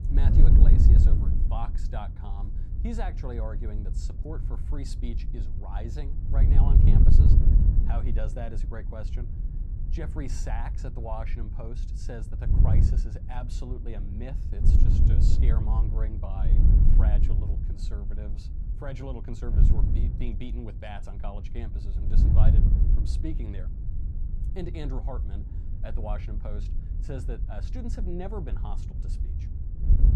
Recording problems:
wind noise on the microphone; heavy; 1 dB below the speech

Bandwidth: 15 kHz